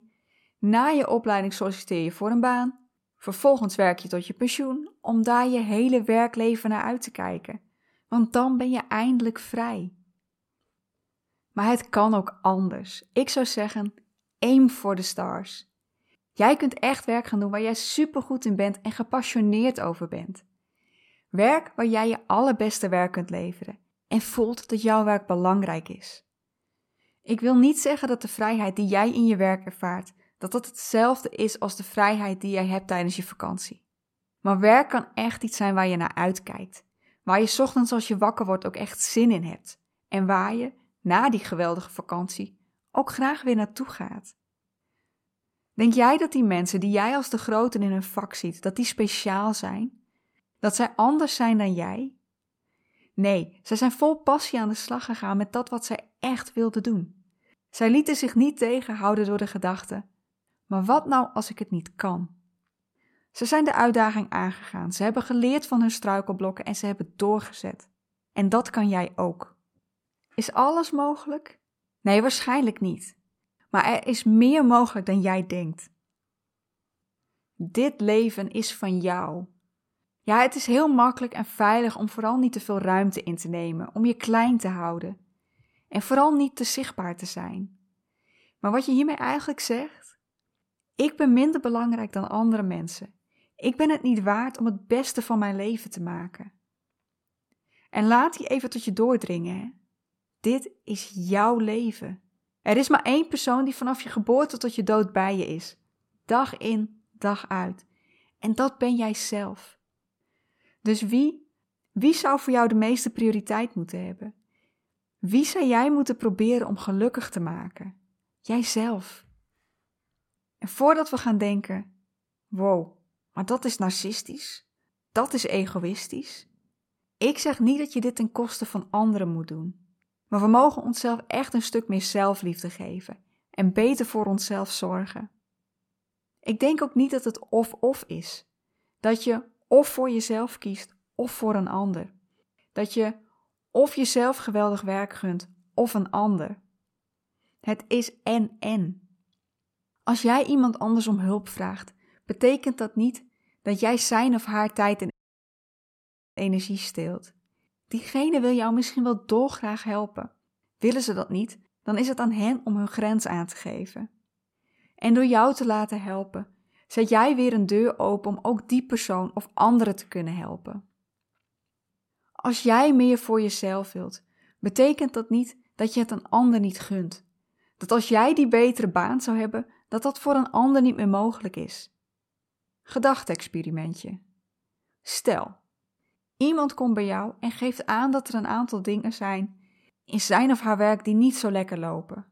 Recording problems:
audio cutting out; at 2:35 for 1.5 s

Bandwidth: 16.5 kHz